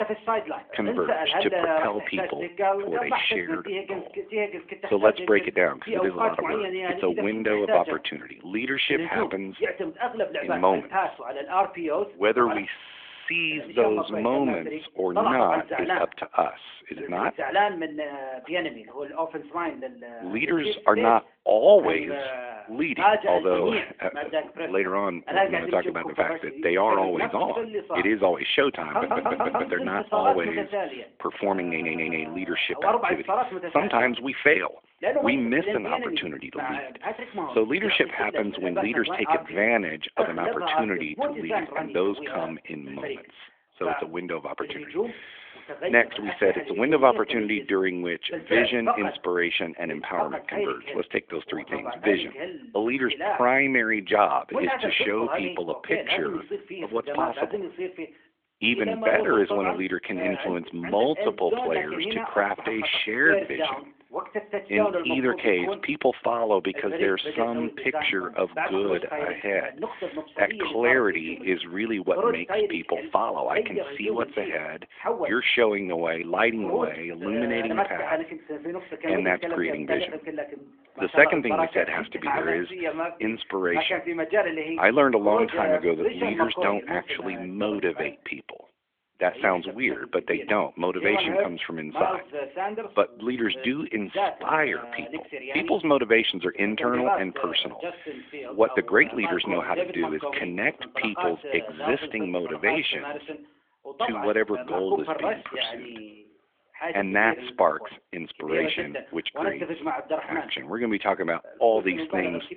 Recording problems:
thin; very; fading below 850 Hz
phone-call audio; nothing above 3.5 kHz
voice in the background; loud; throughout; 4 dB below the speech
audio stuttering; at 13 s, at 29 s and at 32 s

